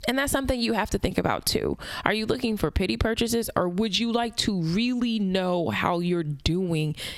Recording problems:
squashed, flat; somewhat

